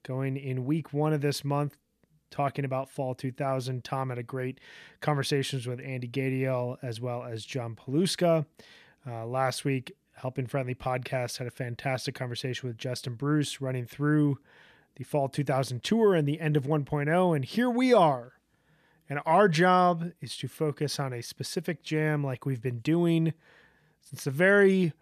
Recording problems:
none

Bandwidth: 14.5 kHz